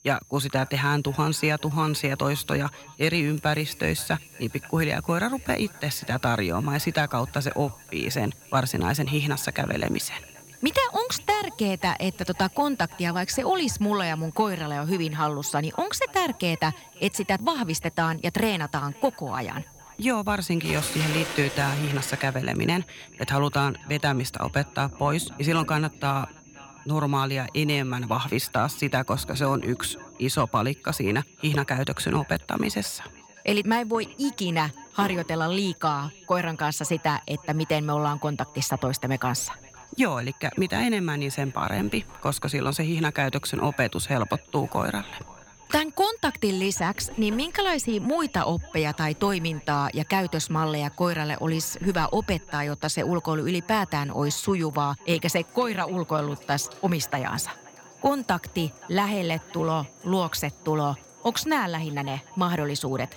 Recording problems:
echo of what is said; faint; throughout; 530 ms later, 25 dB below the speech
household noises; noticeable; throughout; 20 dB below the speech
high-pitched whine; faint; throughout; 6.5 kHz, 25 dB below the speech

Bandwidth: 17 kHz